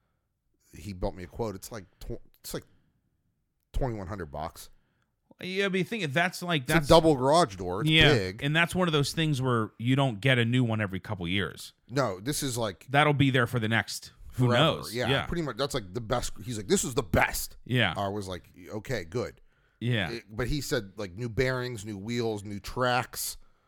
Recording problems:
none

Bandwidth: 18 kHz